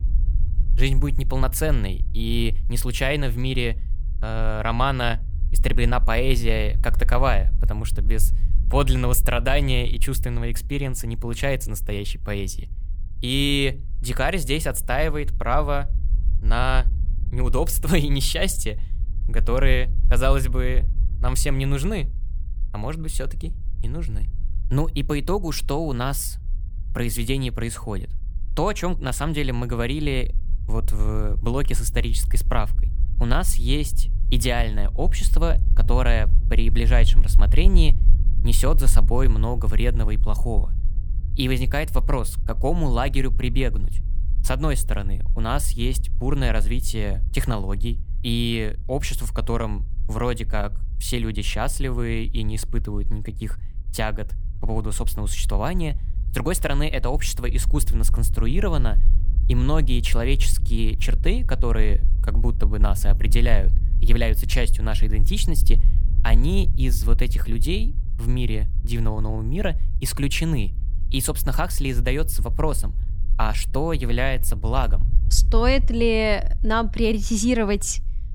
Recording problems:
low rumble; faint; throughout; 20 dB below the speech

